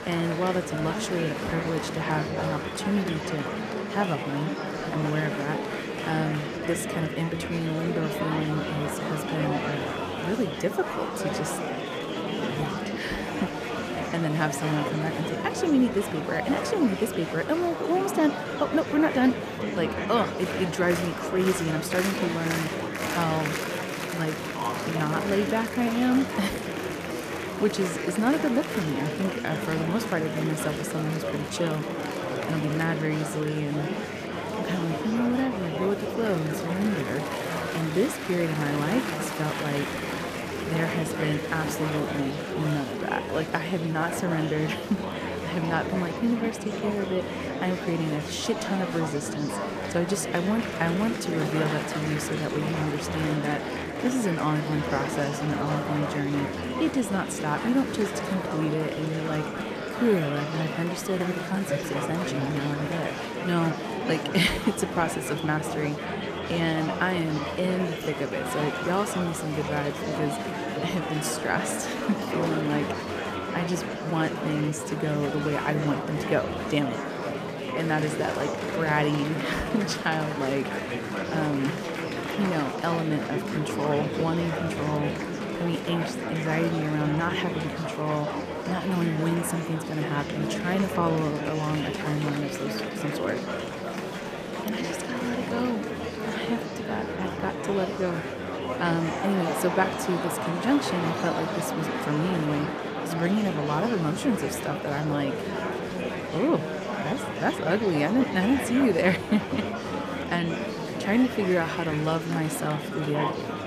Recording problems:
murmuring crowd; loud; throughout; 2 dB below the speech

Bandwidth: 14.5 kHz